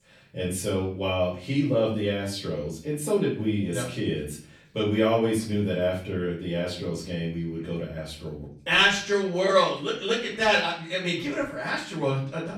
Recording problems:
off-mic speech; far
room echo; noticeable; dies away in 0.4 s

